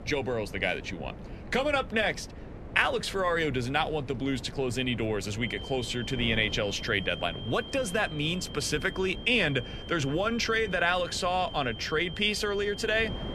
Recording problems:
high-pitched whine; noticeable; from 5.5 s on; 3 kHz, 15 dB below the speech
wind noise on the microphone; occasional gusts; 20 dB below the speech

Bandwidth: 13.5 kHz